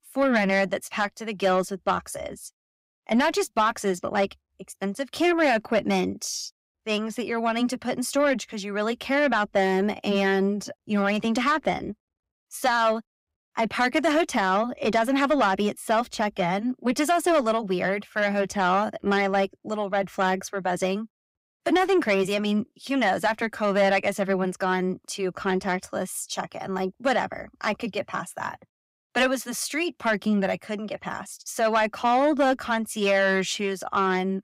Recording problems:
distortion; slight; 10 dB below the speech

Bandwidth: 15.5 kHz